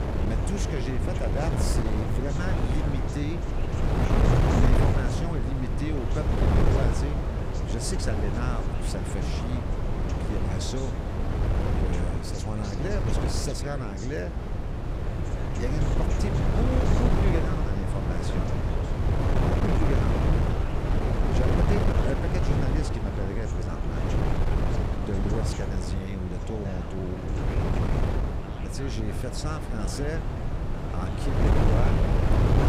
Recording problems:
wind noise on the microphone; heavy; 3 dB above the speech
voice in the background; noticeable; throughout; 10 dB below the speech

